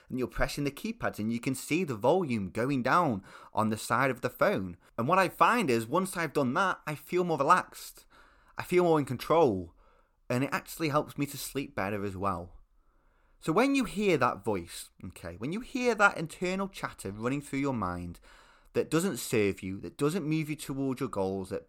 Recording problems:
none

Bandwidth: 18.5 kHz